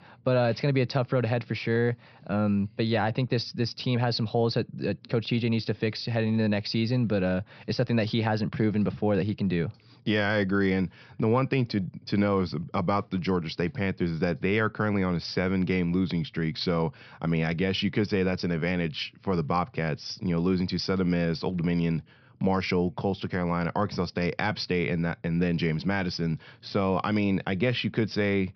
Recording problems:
high frequencies cut off; noticeable; nothing above 5.5 kHz

